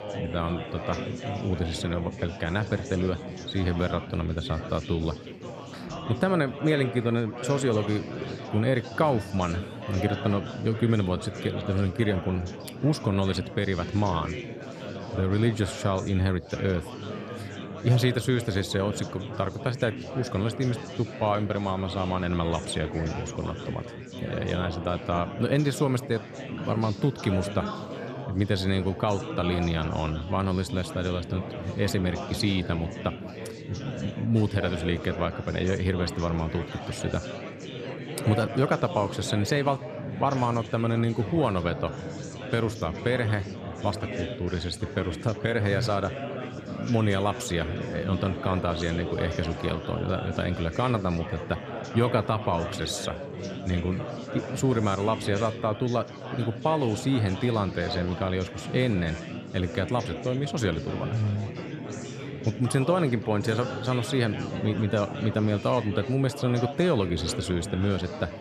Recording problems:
chatter from many people; loud; throughout; 8 dB below the speech

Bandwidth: 14 kHz